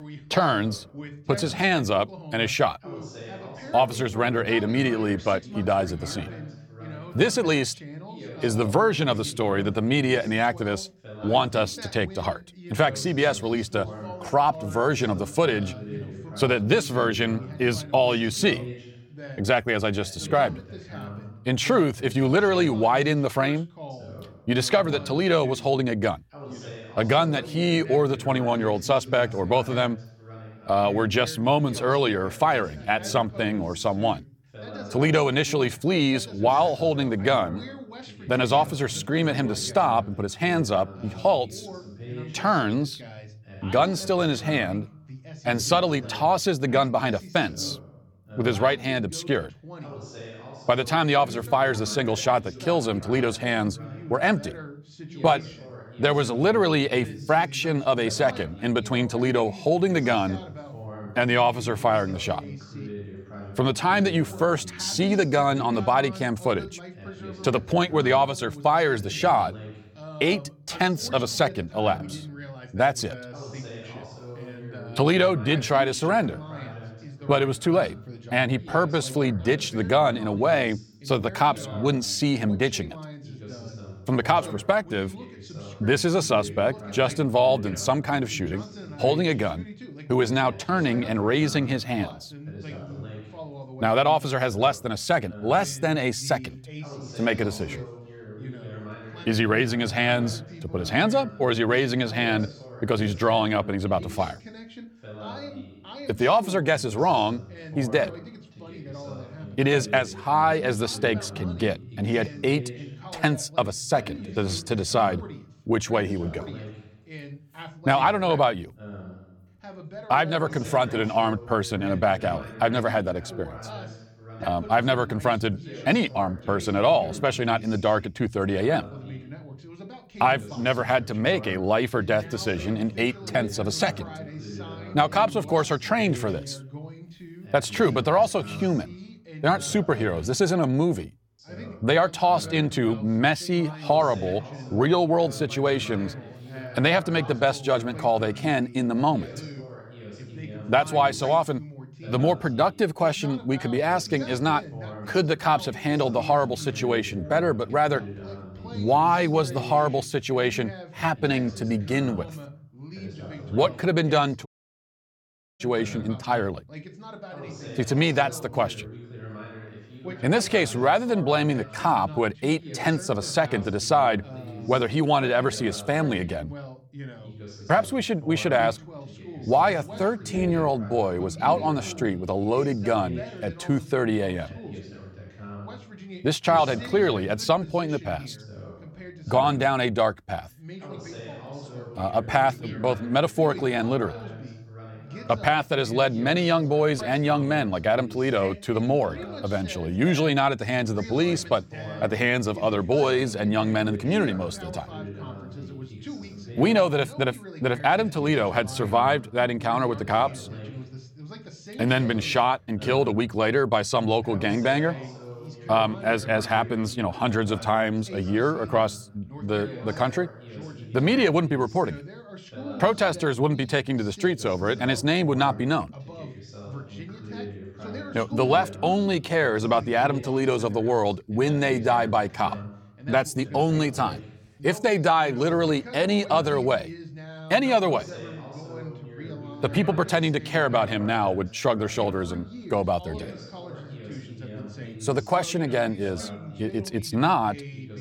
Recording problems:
background chatter; noticeable; throughout; 2 voices, 15 dB below the speech
audio cutting out; at 2:44 for 1 s

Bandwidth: 17.5 kHz